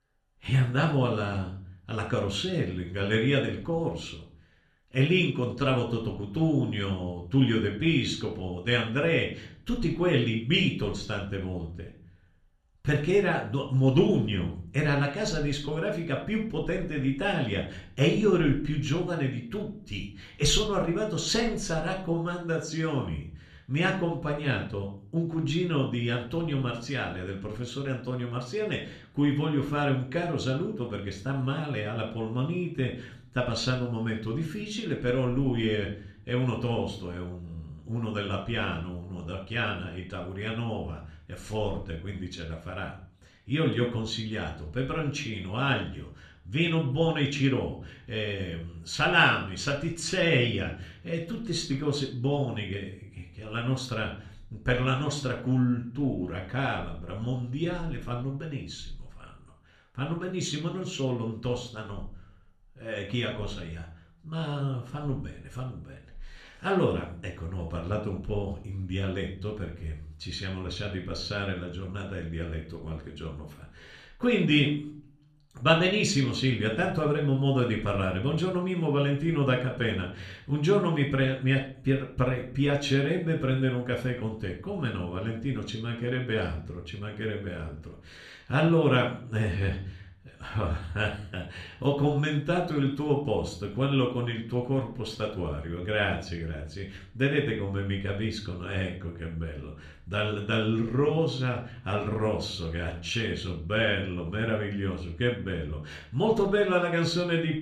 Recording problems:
room echo; slight; dies away in 0.4 s
off-mic speech; somewhat distant

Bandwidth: 14 kHz